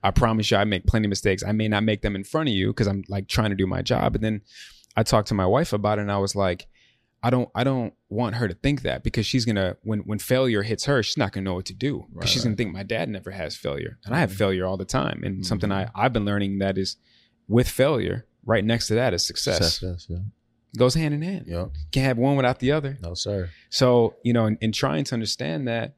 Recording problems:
none

